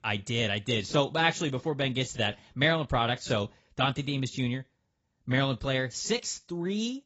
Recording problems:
garbled, watery; badly; nothing above 7.5 kHz

